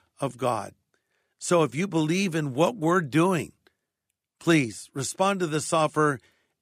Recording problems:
none

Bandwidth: 15 kHz